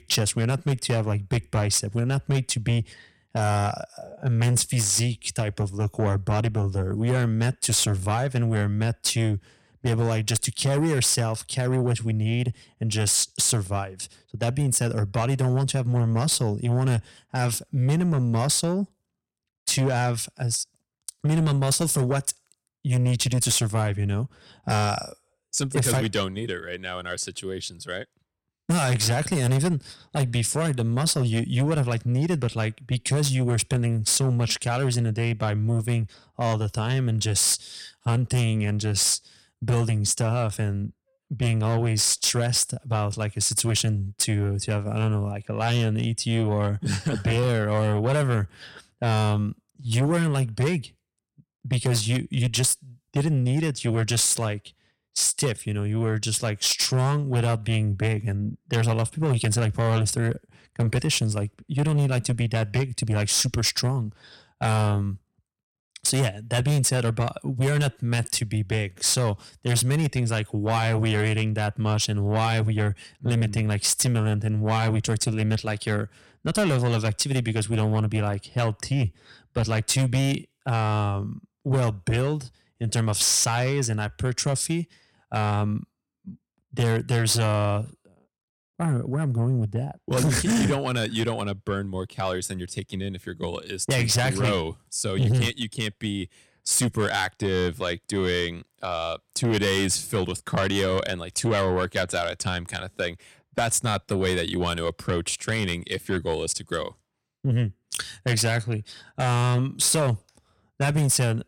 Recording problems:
distortion; slight; 10 dB below the speech

